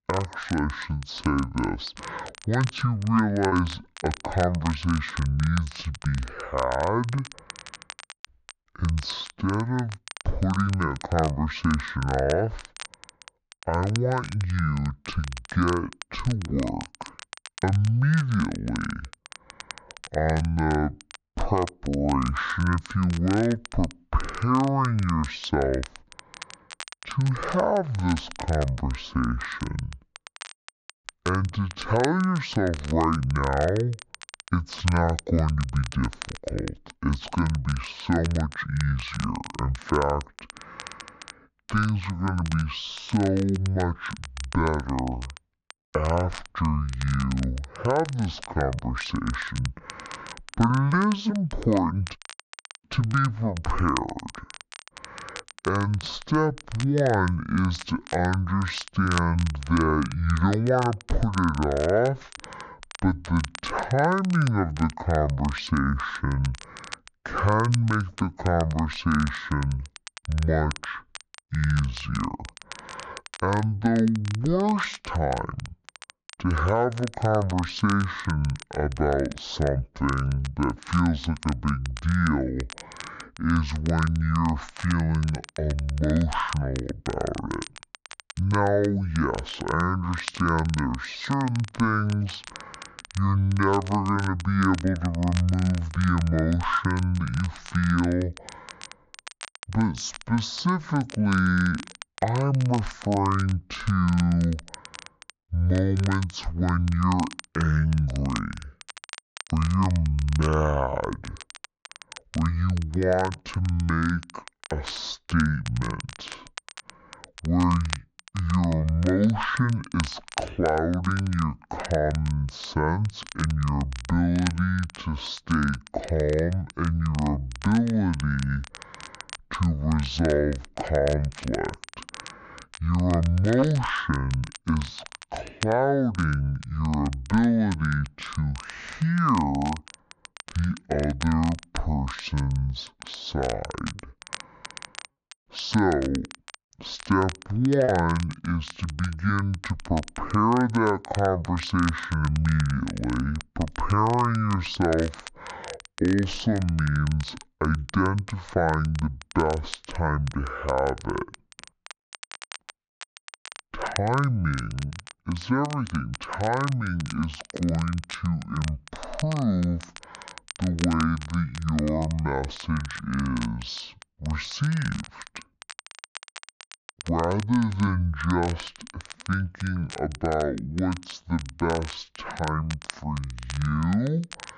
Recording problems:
wrong speed and pitch; too slow and too low; 0.5 times normal speed
high frequencies cut off; noticeable; nothing above 7.5 kHz
muffled; very slightly; fading above 3.5 kHz
crackle, like an old record; noticeable; 15 dB below the speech
choppy; occasionally; at 3.5 s and from 2:24 to 2:28; 3% of the speech affected

